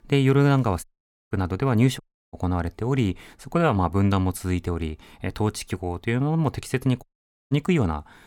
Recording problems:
audio cutting out; at 1 s, at 2 s and at 7 s

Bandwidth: 18 kHz